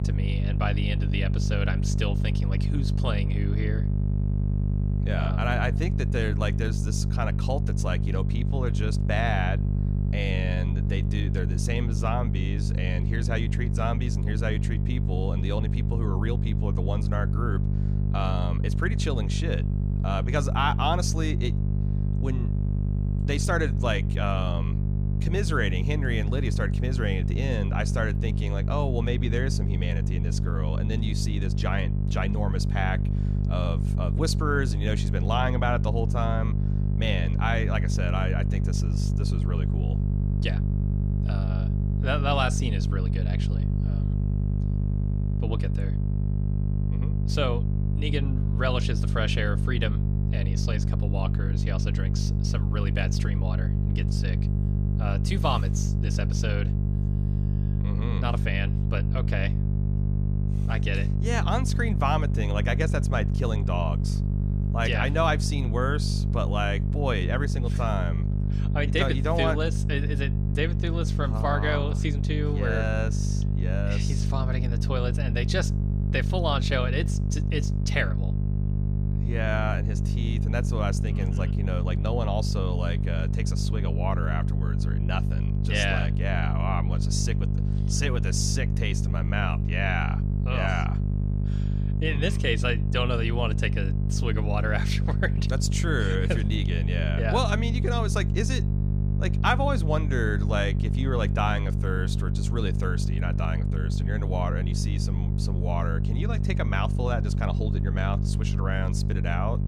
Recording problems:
electrical hum; loud; throughout; 50 Hz, 7 dB below the speech

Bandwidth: 15 kHz